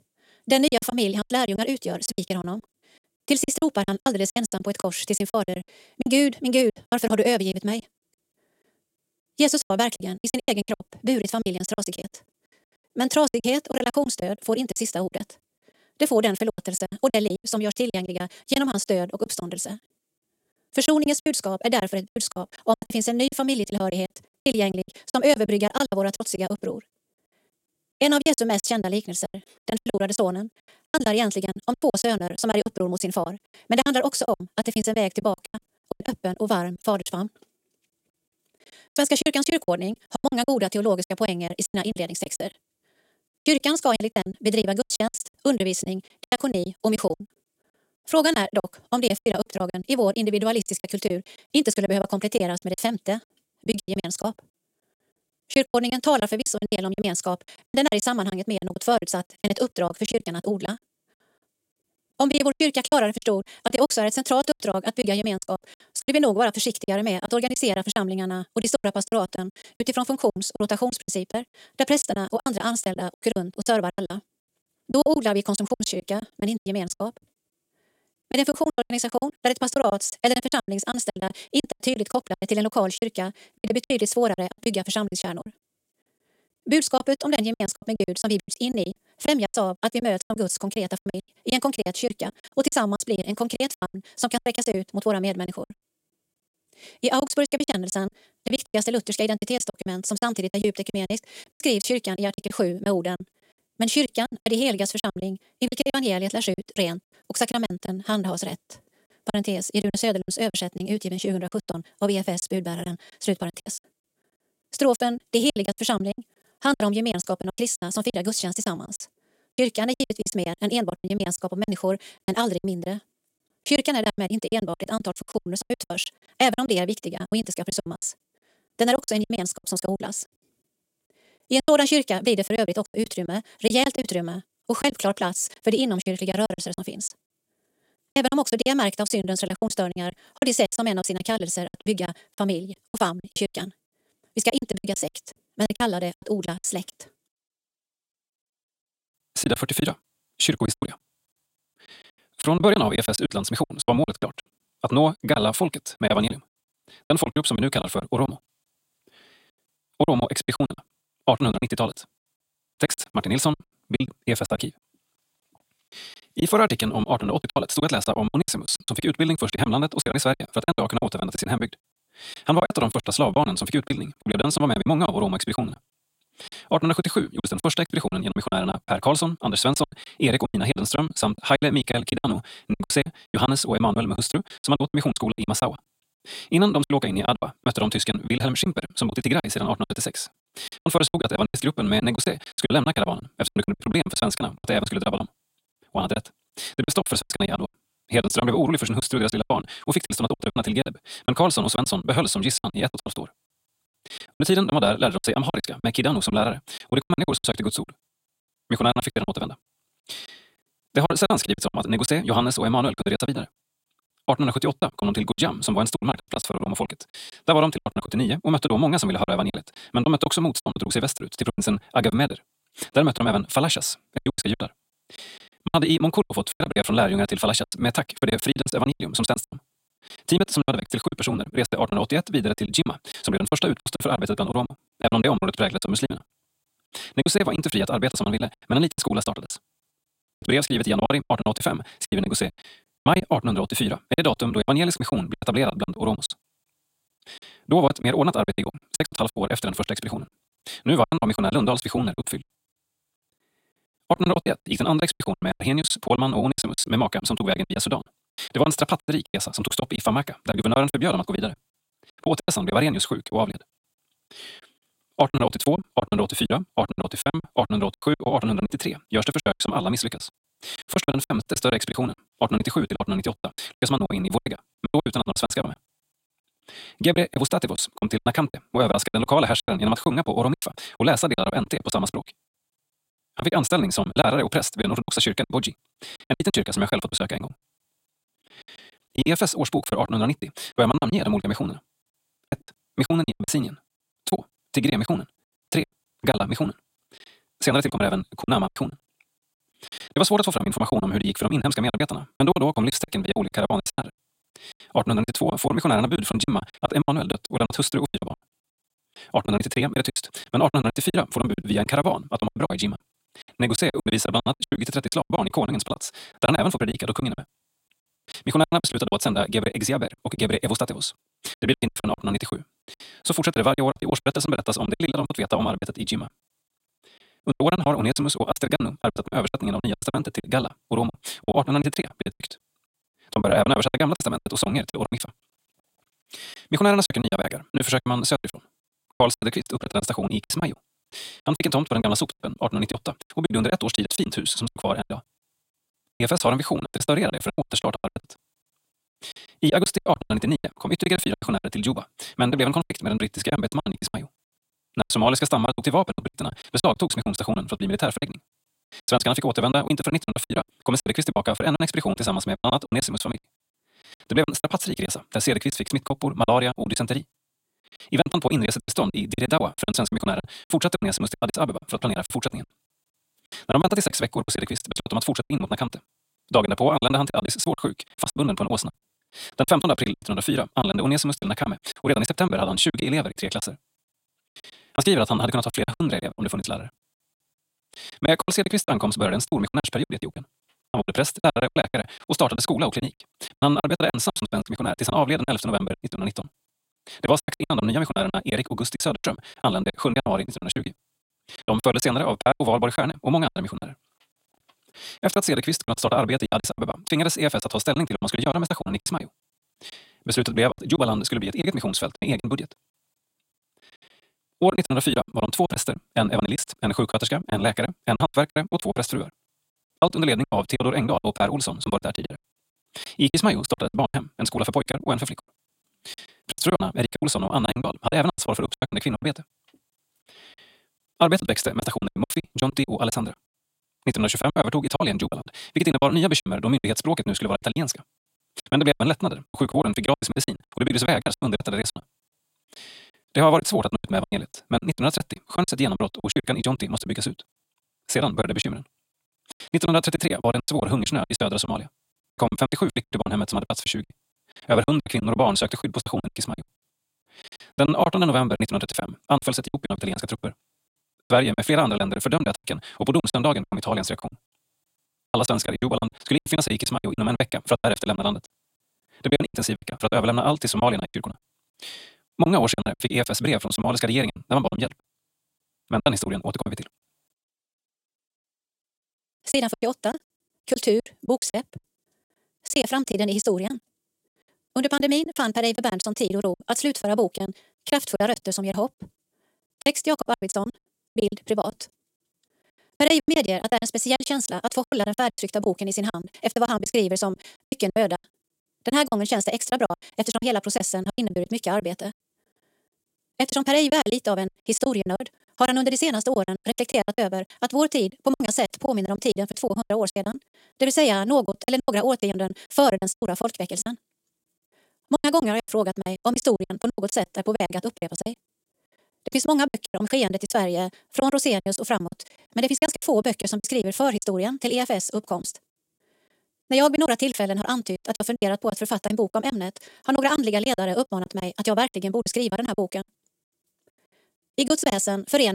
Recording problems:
wrong speed, natural pitch; too fast; 1.6 times normal speed
choppy; very; 18% of the speech affected
abrupt cut into speech; at the end

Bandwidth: 16 kHz